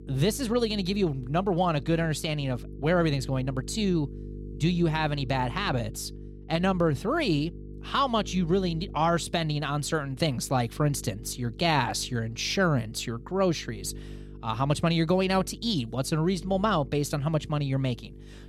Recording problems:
electrical hum; faint; throughout; 50 Hz, 20 dB below the speech

